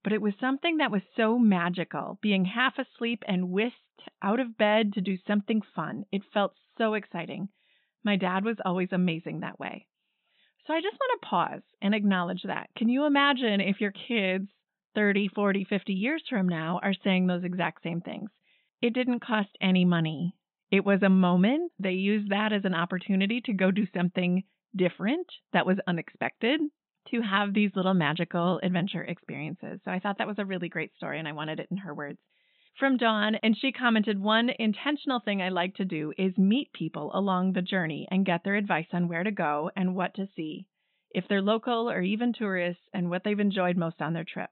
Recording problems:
high frequencies cut off; severe; nothing above 4 kHz

